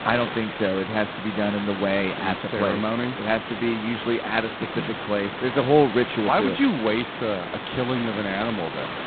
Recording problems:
phone-call audio; poor line; nothing above 4 kHz
hiss; loud; throughout; 7 dB below the speech

